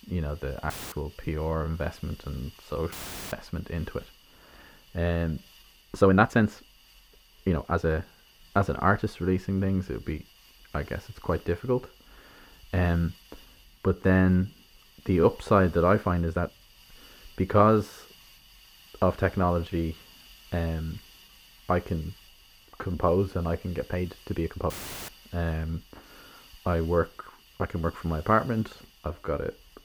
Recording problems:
muffled; very; fading above 3 kHz
hiss; faint; throughout; 25 dB below the speech
uneven, jittery; strongly; from 0.5 to 29 s
audio cutting out; filled with static; at 0.5 s, at 3 s and at 25 s

